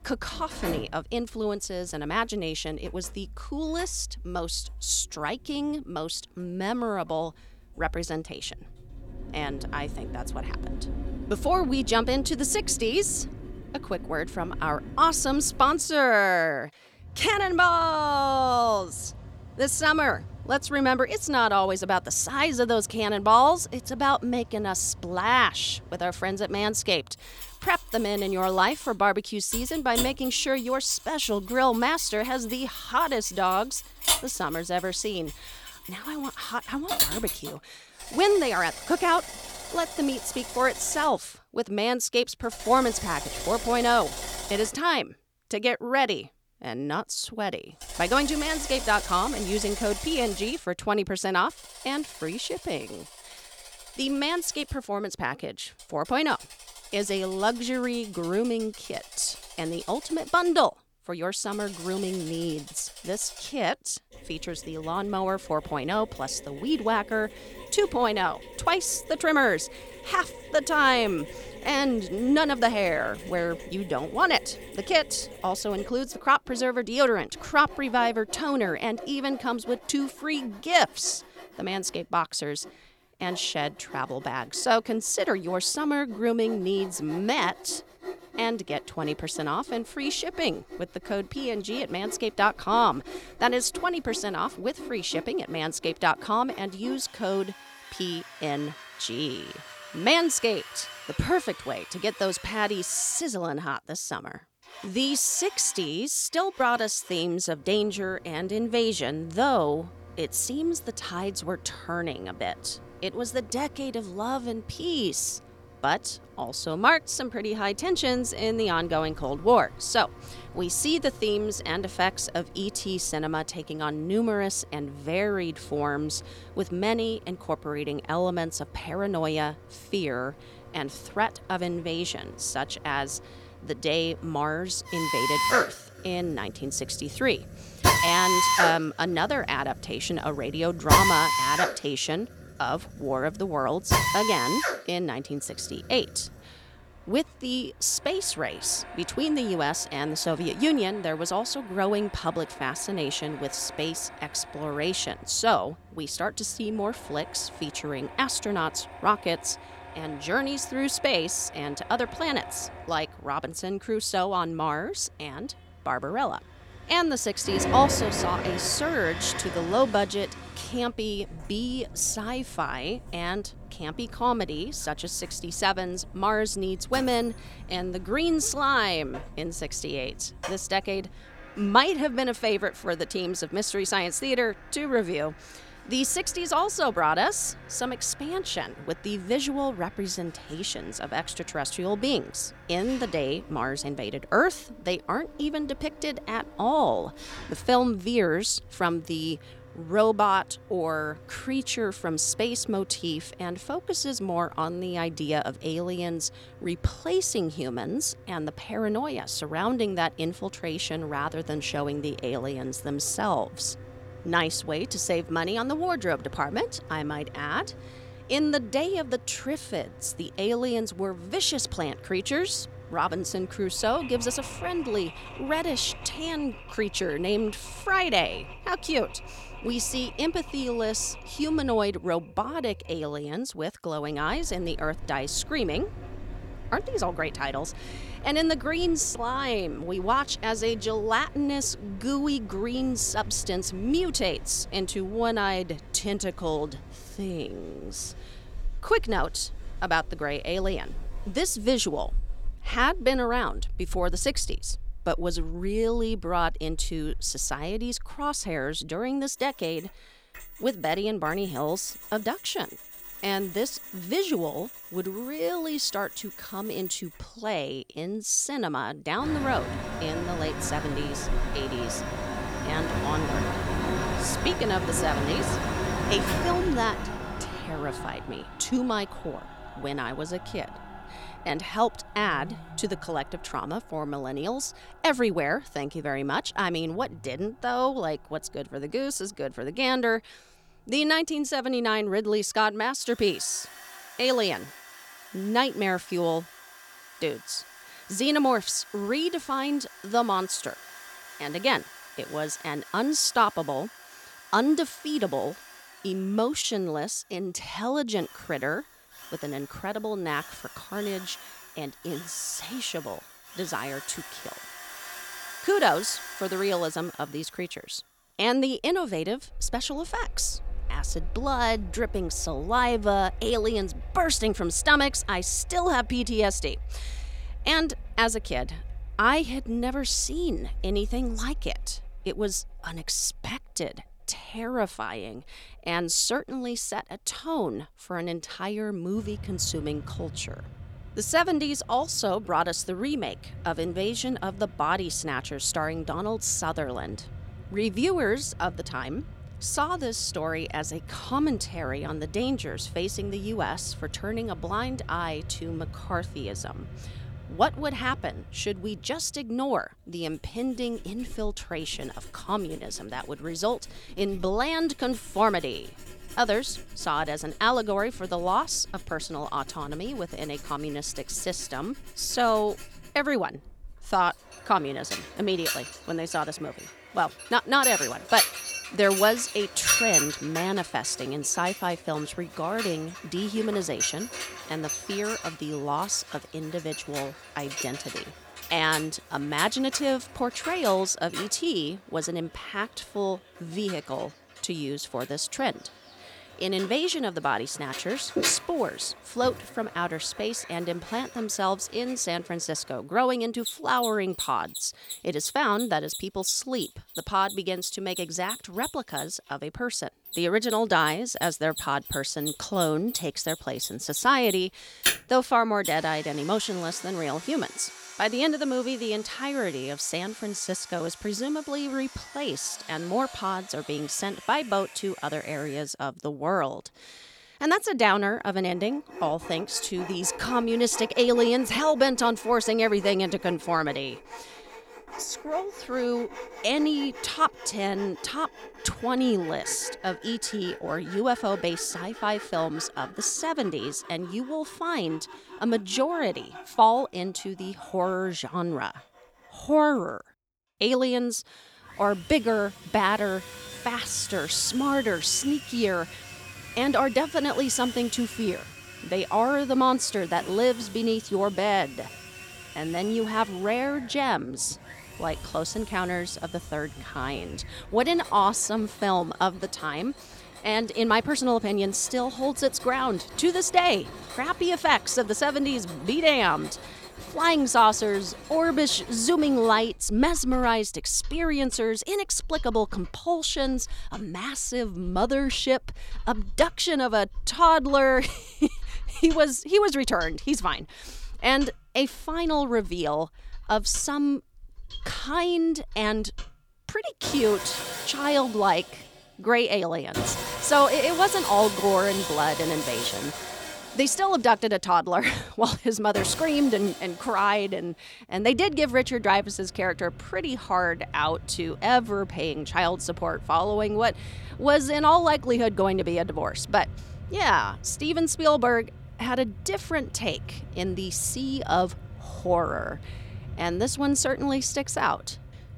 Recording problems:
machinery noise; loud; throughout; 10 dB below the speech

